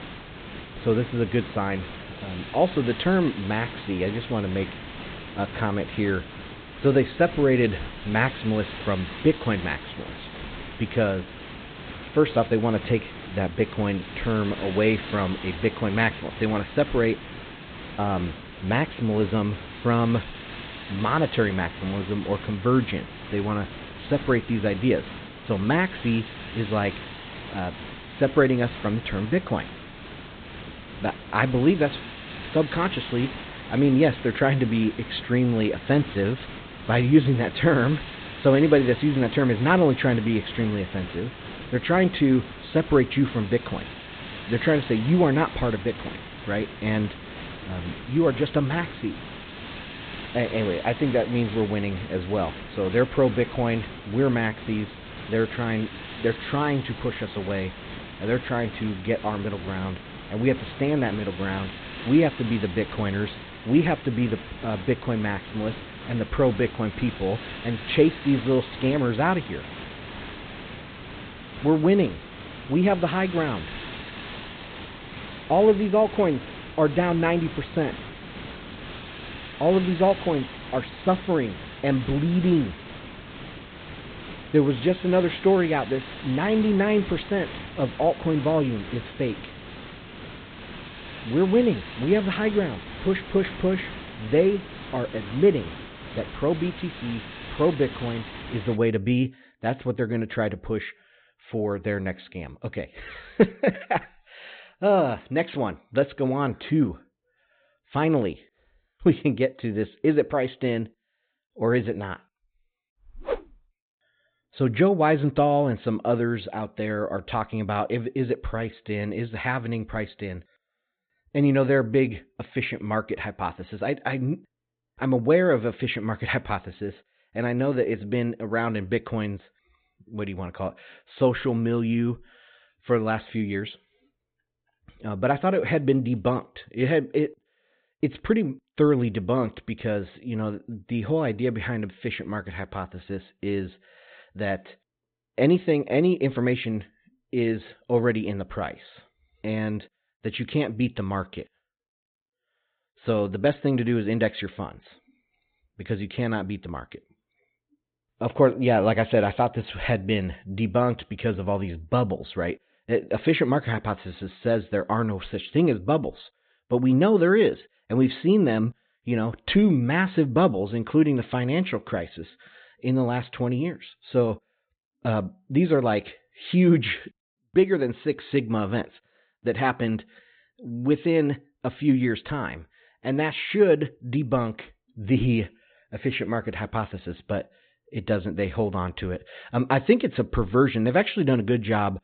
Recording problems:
high frequencies cut off; severe; nothing above 4 kHz
hiss; noticeable; until 1:39; 15 dB below the speech

